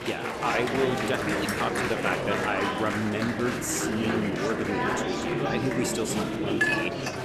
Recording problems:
murmuring crowd; very loud; throughout; 2 dB above the speech
jangling keys; faint; at 1.5 s; peak 10 dB below the speech
clattering dishes; loud; at 6.5 s; peak 5 dB above the speech

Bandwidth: 13.5 kHz